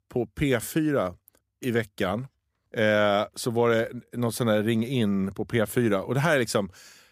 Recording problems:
none

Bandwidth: 15 kHz